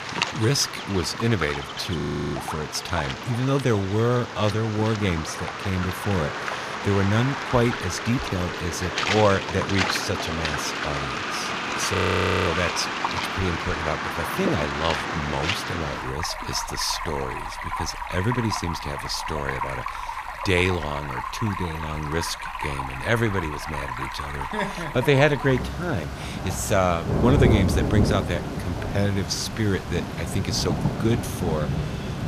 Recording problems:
rain or running water; loud; throughout; 3 dB below the speech
audio freezing; at 2 s and at 12 s for 0.5 s

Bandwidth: 14.5 kHz